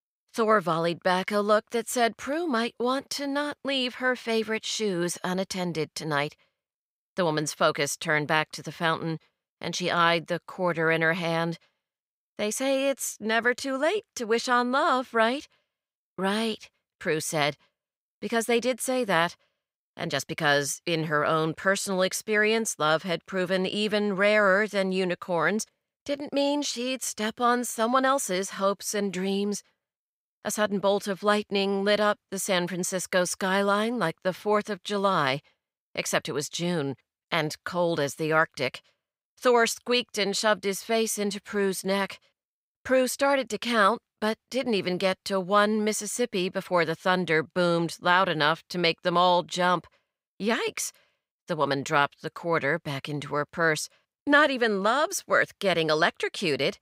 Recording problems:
none

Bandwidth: 15.5 kHz